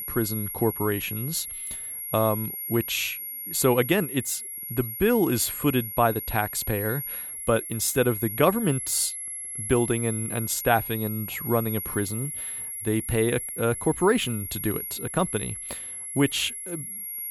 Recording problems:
high-pitched whine; loud; throughout; 11.5 kHz, 6 dB below the speech

